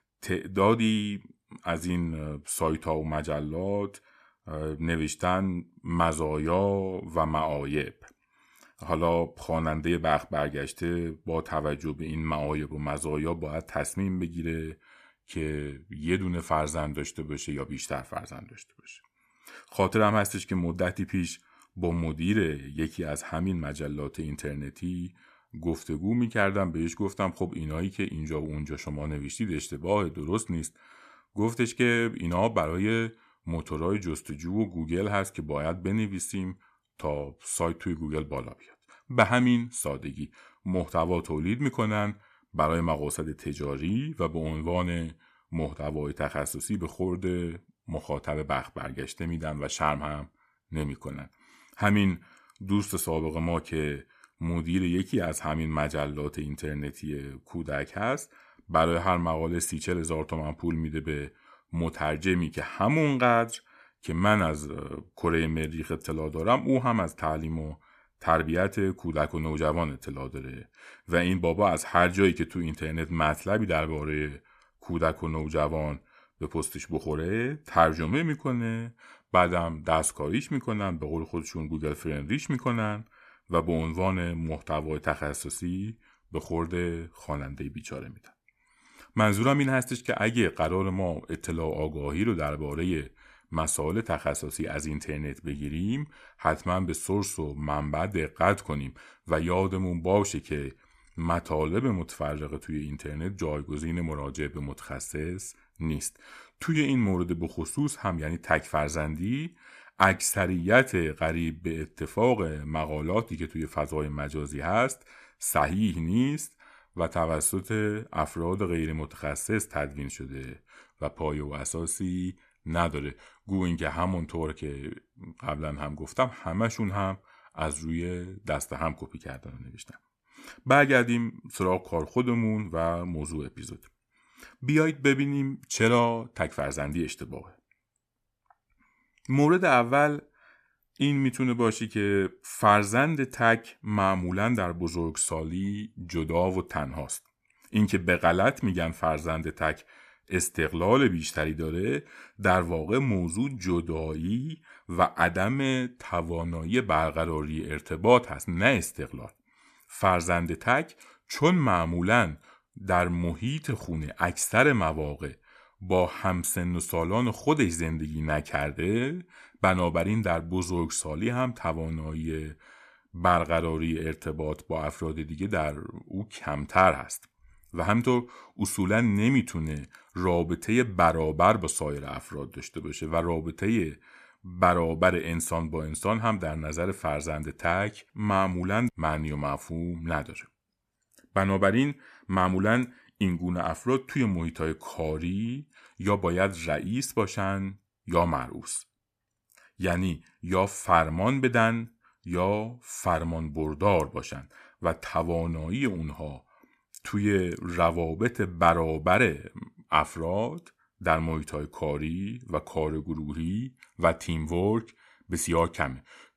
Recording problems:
none

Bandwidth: 14.5 kHz